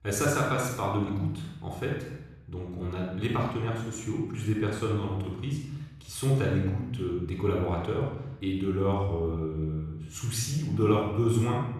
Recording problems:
room echo; noticeable; dies away in 0.9 s
off-mic speech; somewhat distant

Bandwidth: 14 kHz